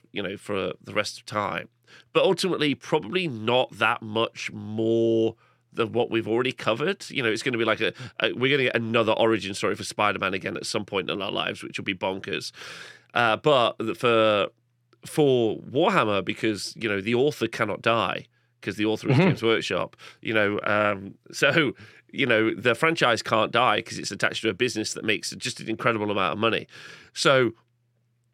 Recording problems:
none

